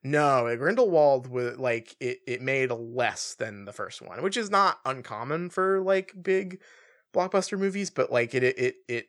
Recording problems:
none

